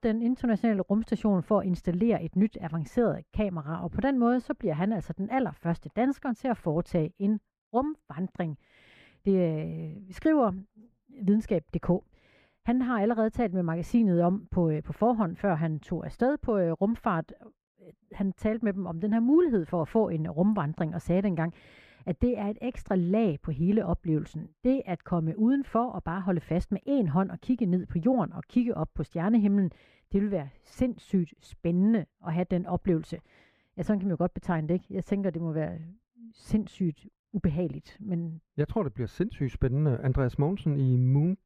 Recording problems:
muffled; very; fading above 3 kHz

